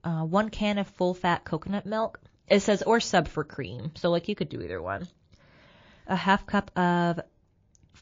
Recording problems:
garbled, watery; slightly

